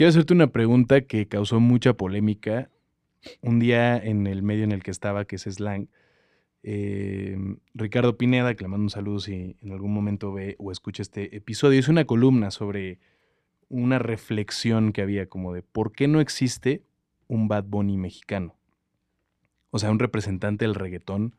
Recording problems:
abrupt cut into speech; at the start

